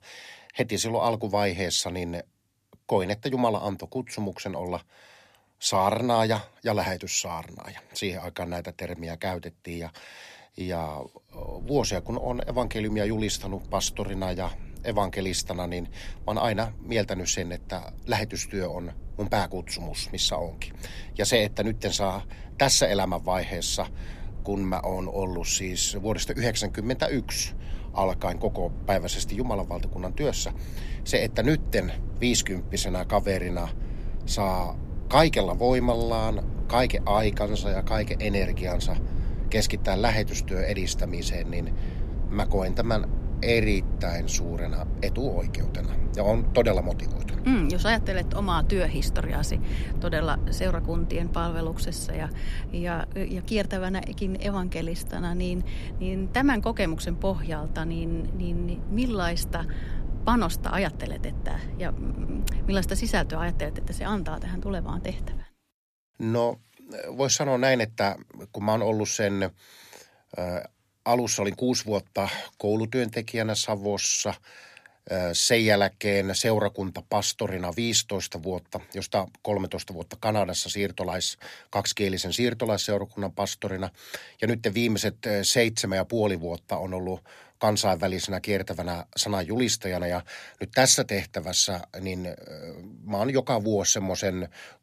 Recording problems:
low rumble; noticeable; from 11 s to 1:05; 20 dB below the speech

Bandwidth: 14.5 kHz